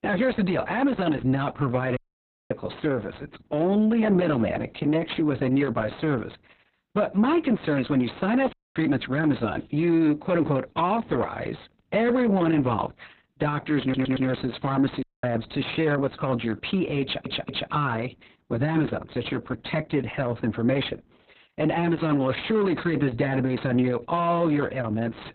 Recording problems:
garbled, watery; badly; nothing above 4 kHz
distortion; slight; 9 dB below the speech
audio cutting out; at 2 s for 0.5 s, at 8.5 s and at 15 s
audio stuttering; at 14 s and at 17 s

